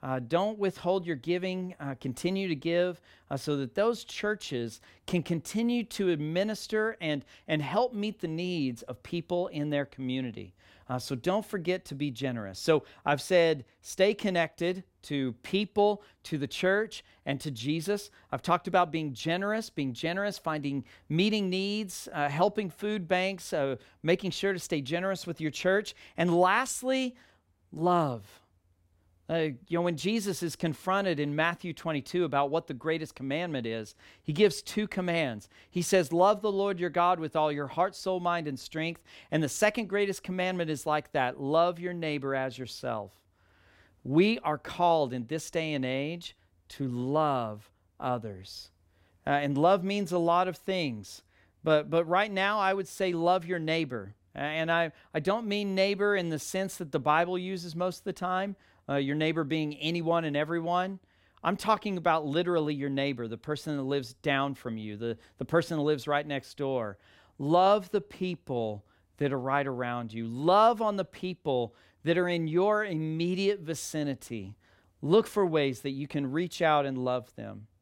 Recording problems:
none

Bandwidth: 16.5 kHz